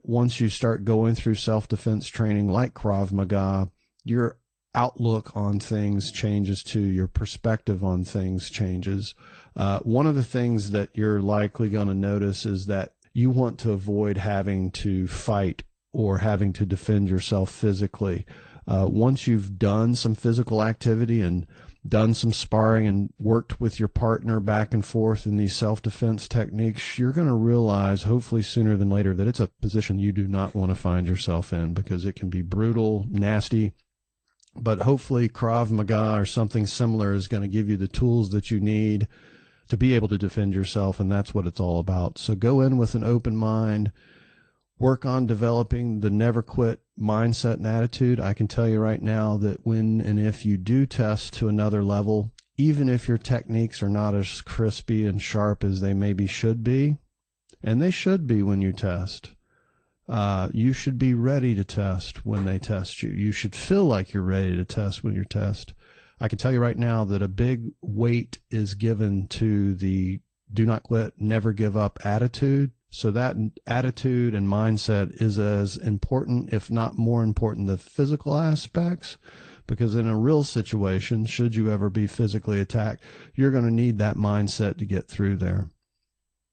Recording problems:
garbled, watery; slightly; nothing above 8.5 kHz
uneven, jittery; strongly; from 2 s to 1:19

